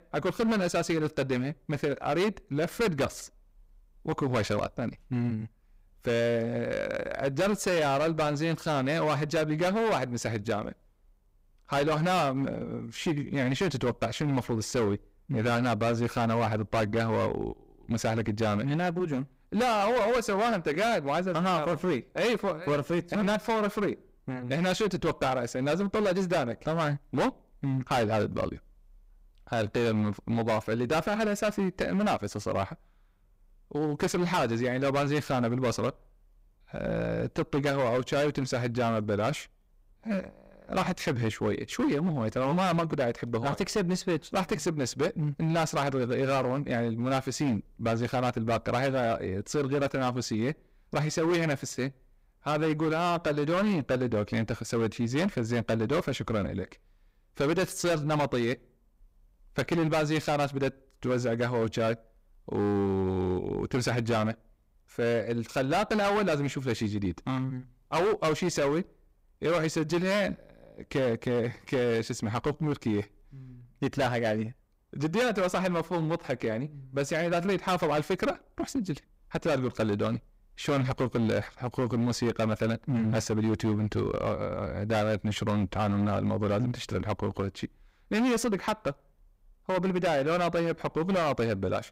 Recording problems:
distortion; heavy; 13% of the sound clipped

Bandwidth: 15.5 kHz